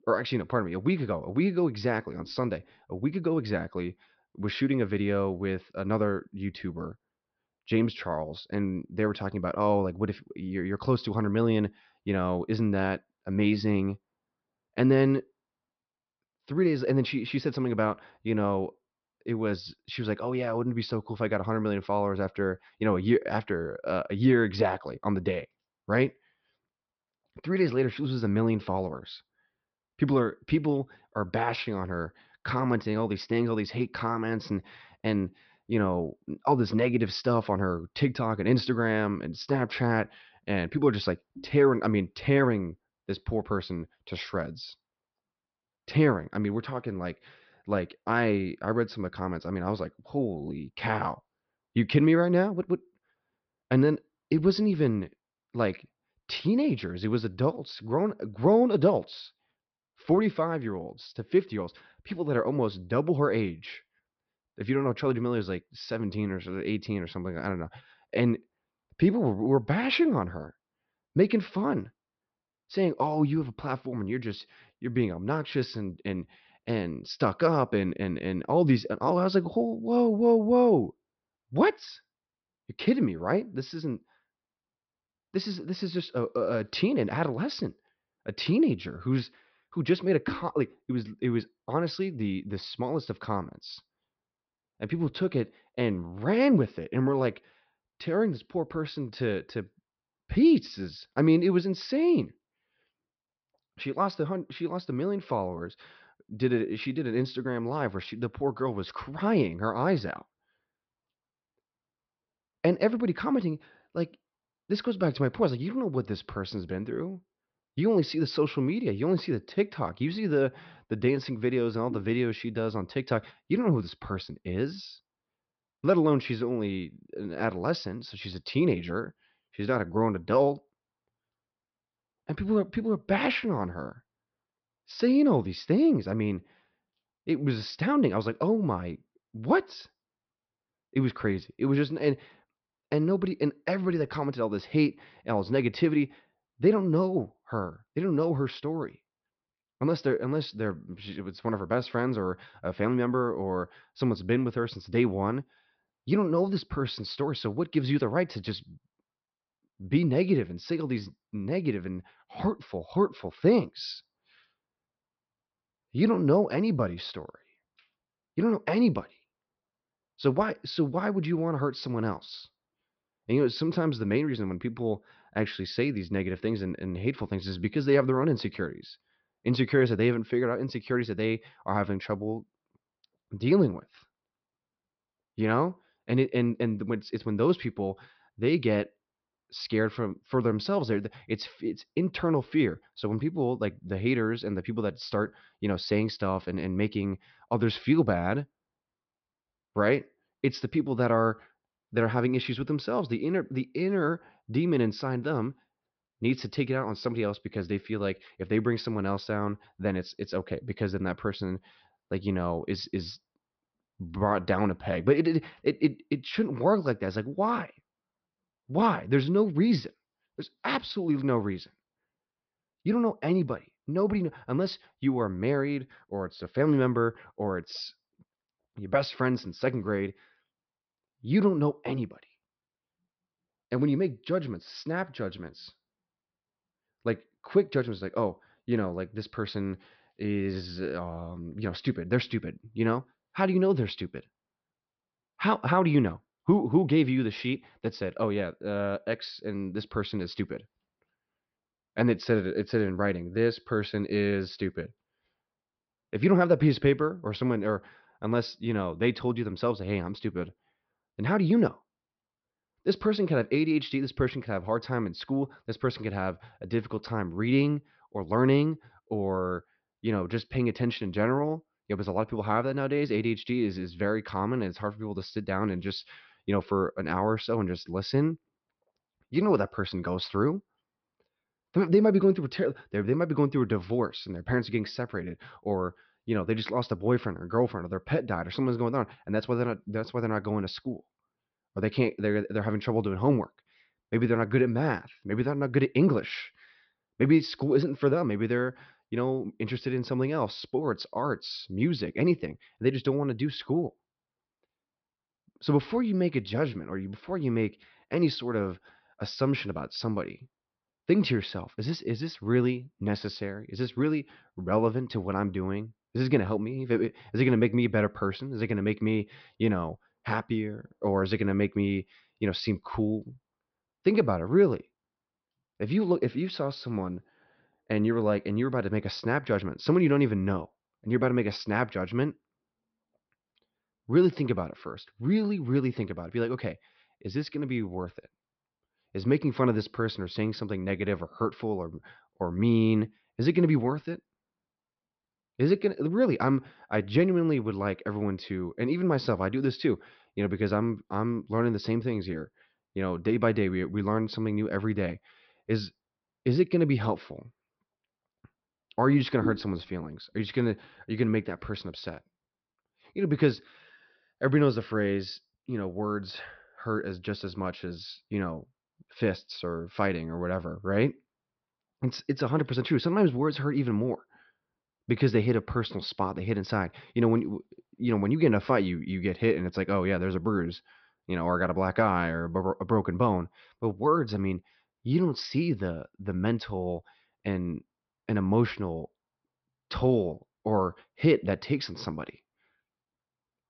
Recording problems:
high frequencies cut off; noticeable; nothing above 5.5 kHz

